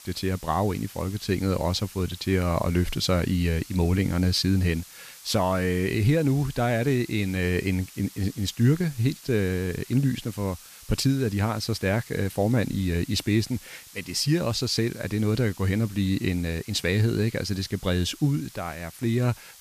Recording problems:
hiss; noticeable; throughout; 20 dB below the speech

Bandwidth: 14.5 kHz